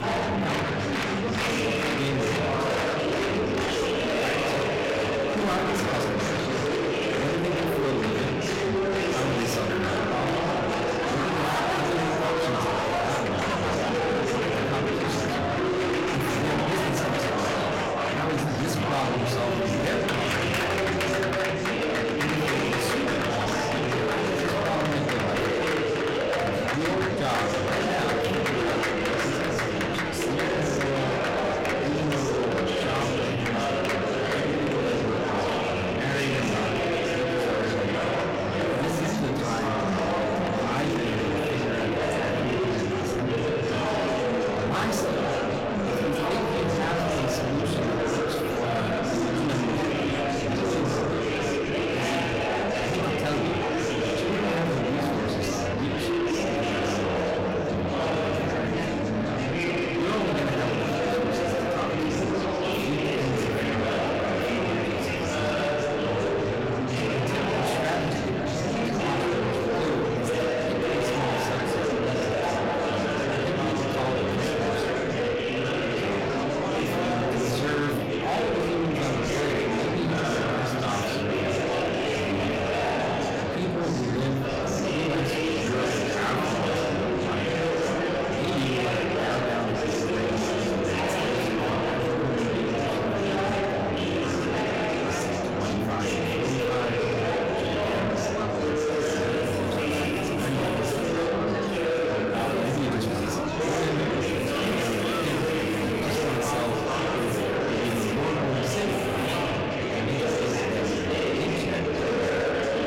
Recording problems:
distortion; heavy; 8 dB below the speech
echo of what is said; faint; from 24 s on; 480 ms later, 25 dB below the speech
room echo; slight; dies away in 0.5 s
off-mic speech; somewhat distant
murmuring crowd; very loud; throughout; 4 dB above the speech
background music; noticeable; throughout; 20 dB below the speech

